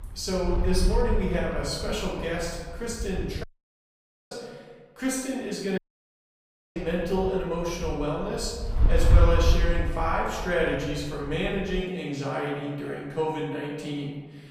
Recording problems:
off-mic speech; far
room echo; noticeable; dies away in 1.3 s
wind noise on the microphone; occasional gusts; until 3.5 s and from 7 to 12 s; 15 dB below the speech
audio cutting out; at 3.5 s for 1 s and at 6 s for 1 s

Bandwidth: 15 kHz